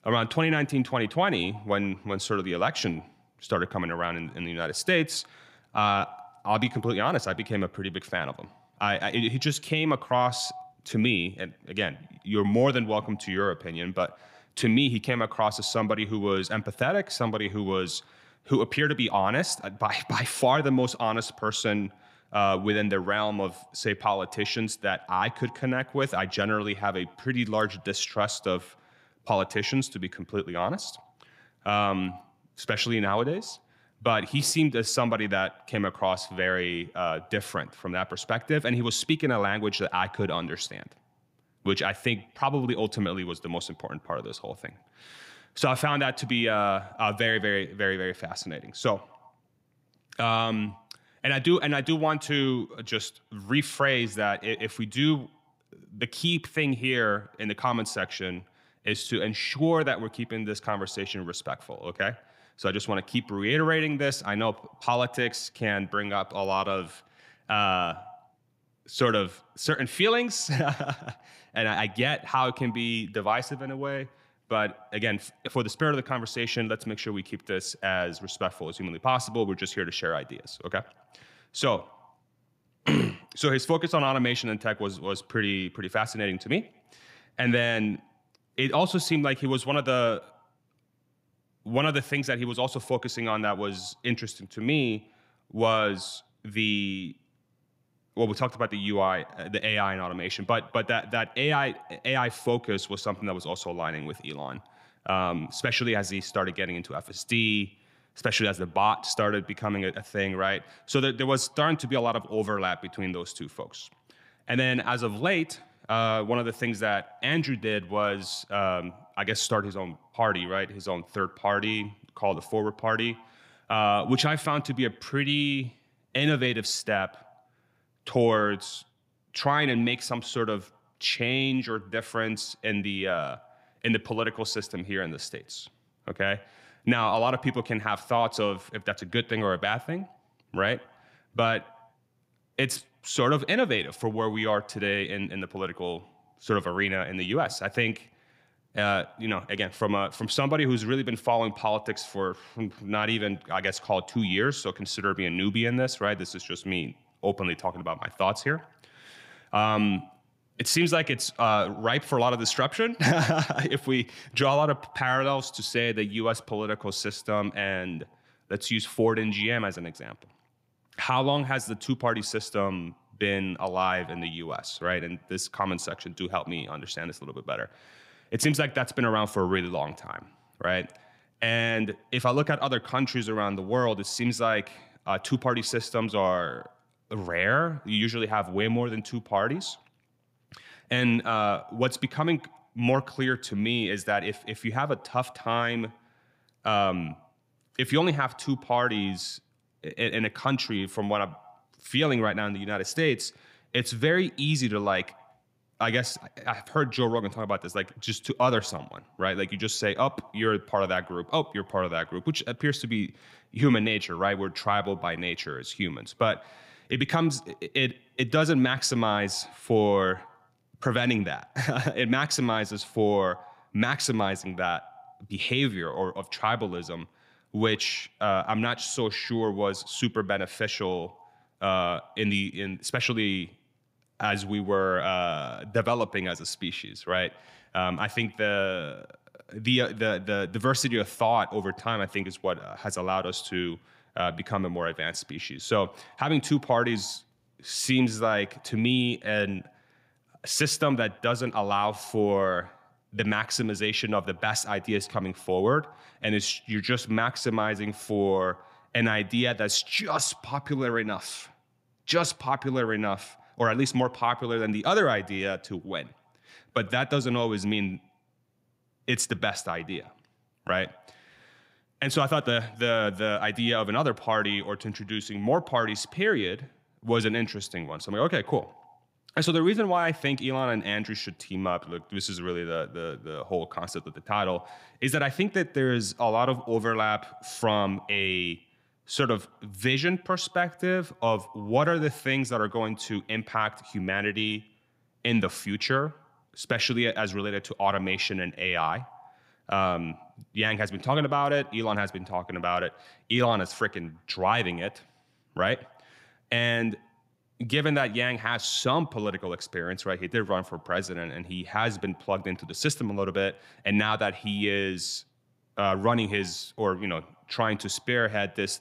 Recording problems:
echo of what is said; faint; throughout; 110 ms later, 25 dB below the speech

